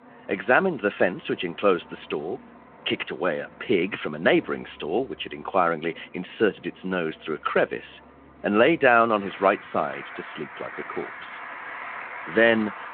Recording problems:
phone-call audio
traffic noise; noticeable; throughout; 15 dB below the speech

